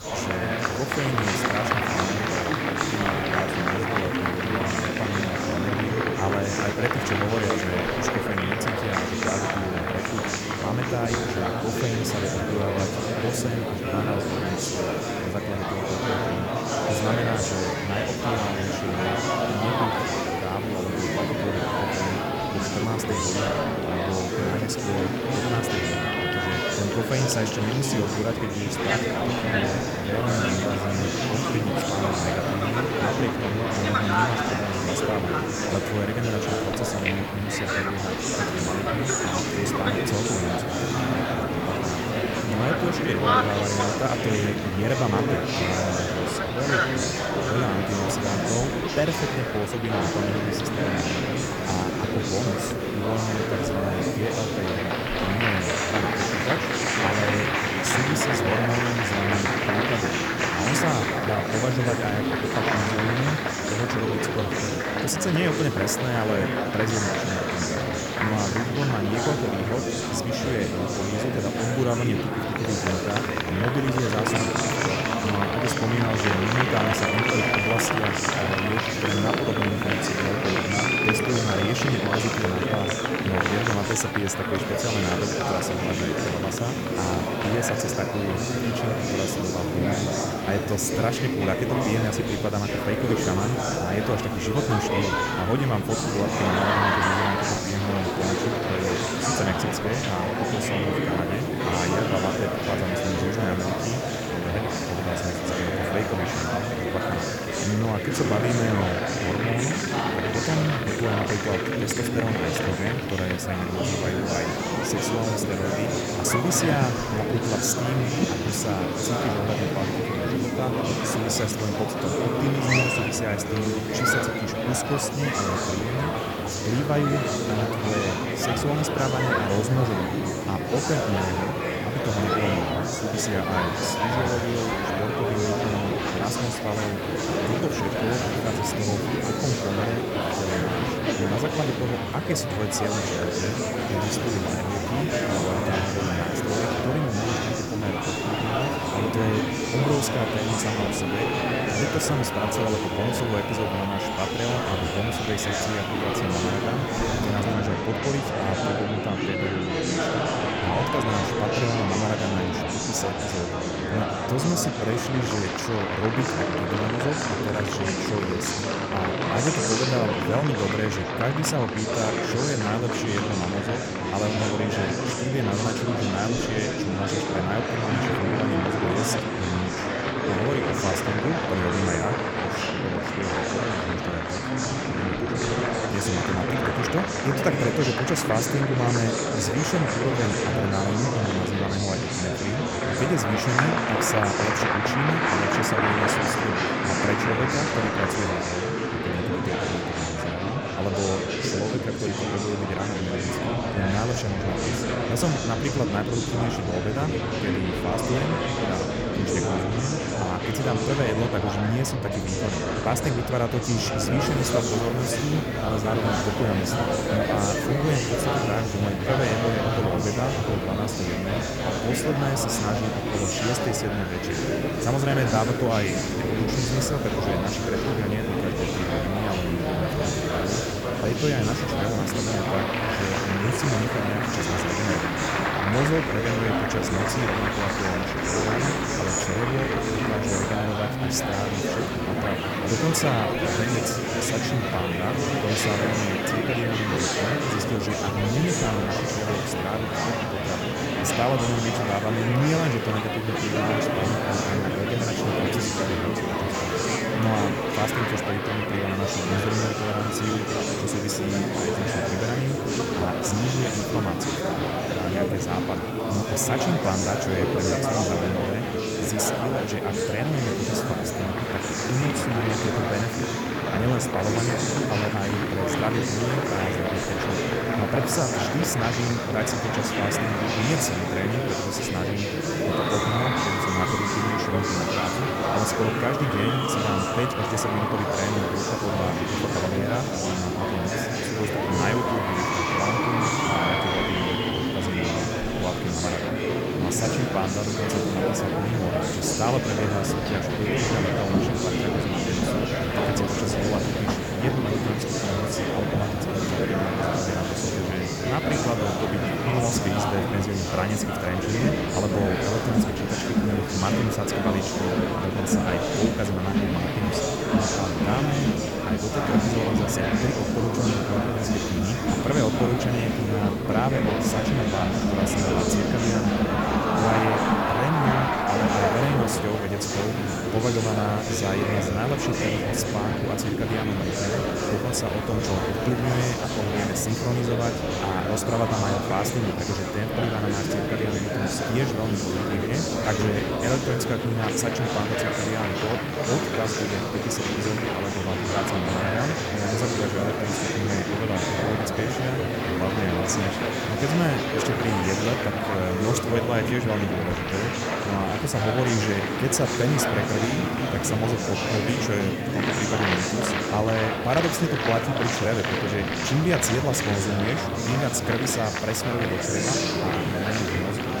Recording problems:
murmuring crowd; very loud; throughout; 3 dB above the speech
hiss; noticeable; until 2:38 and from 3:34 on; 15 dB below the speech

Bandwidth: 18 kHz